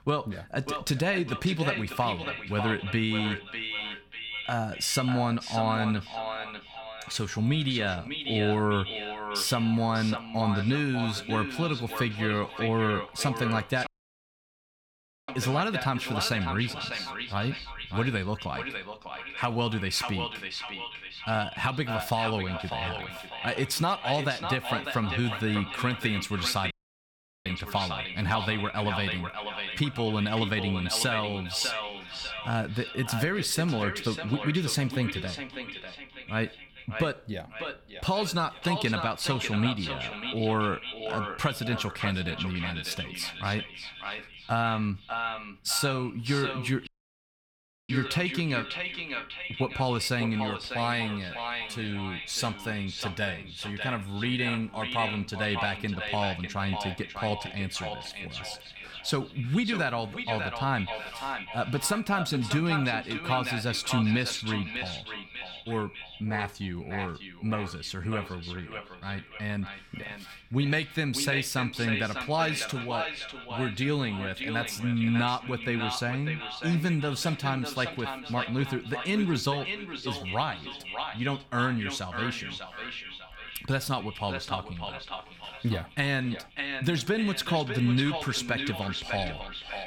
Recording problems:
echo of what is said; strong; throughout; 600 ms later, 6 dB below the speech
audio cutting out; at 14 s for 1.5 s, at 27 s for 1 s and at 47 s for 1 s

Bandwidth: 18 kHz